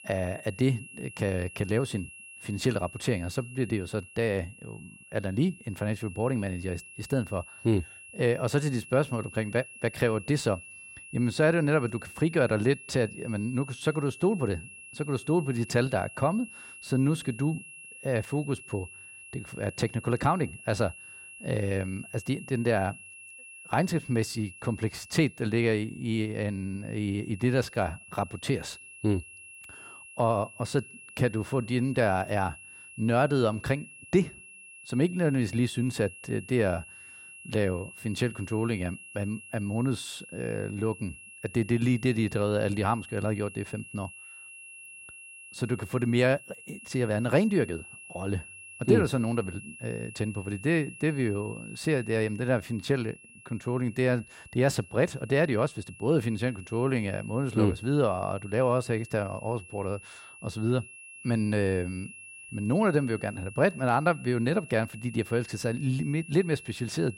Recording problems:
high-pitched whine; noticeable; throughout; 2.5 kHz, 15 dB below the speech

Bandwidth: 16 kHz